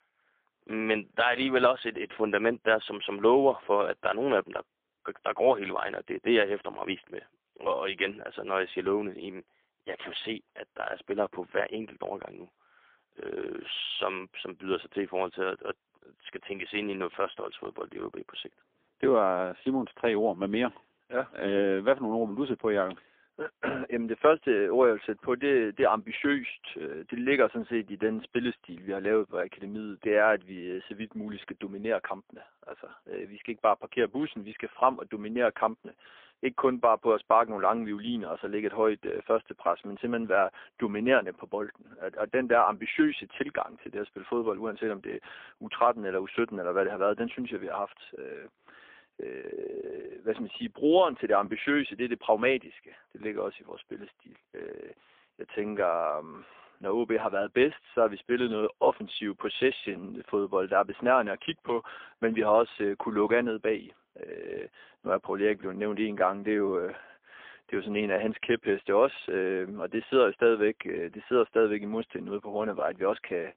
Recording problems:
phone-call audio; poor line; nothing above 3.5 kHz

